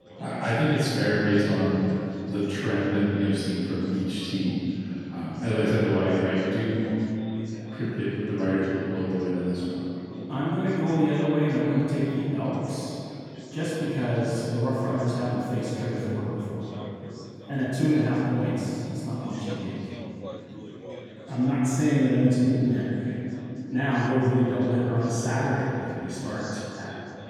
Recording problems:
room echo; strong; dies away in 3 s
off-mic speech; far
background chatter; noticeable; throughout; 4 voices, 20 dB below the speech

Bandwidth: 18 kHz